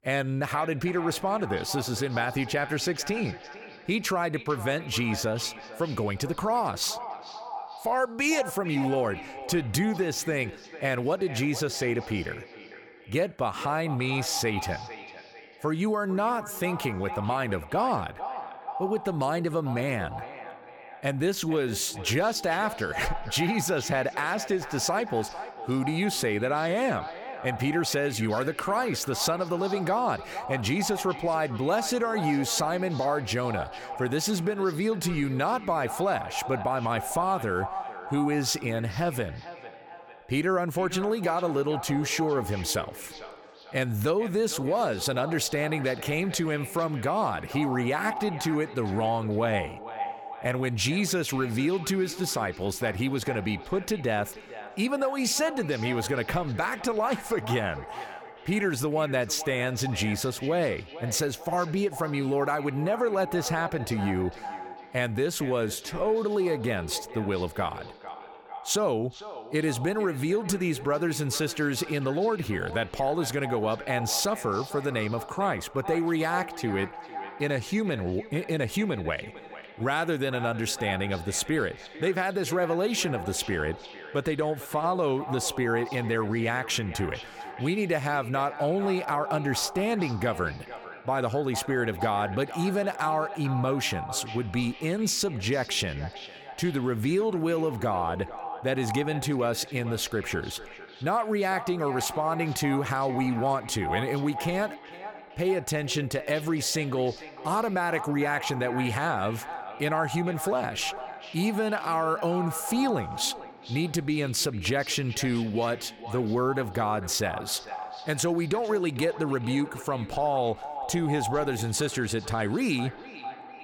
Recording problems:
echo of what is said; strong; throughout; 450 ms later, 10 dB below the speech

